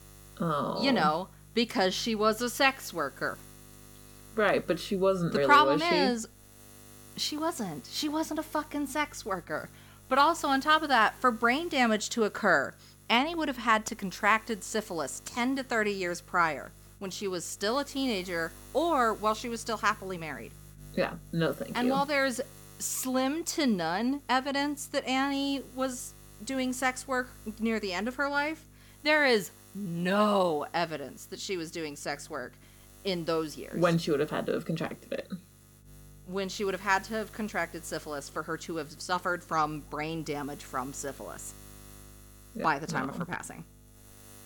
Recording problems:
electrical hum; faint; throughout; 50 Hz, 30 dB below the speech

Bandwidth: 18 kHz